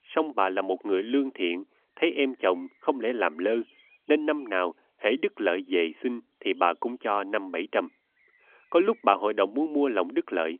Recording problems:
phone-call audio; nothing above 3.5 kHz

